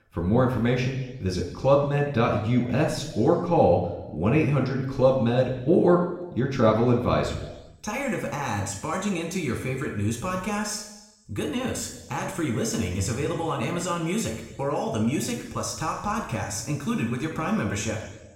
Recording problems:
room echo; noticeable; dies away in 1 s
off-mic speech; somewhat distant

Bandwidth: 16 kHz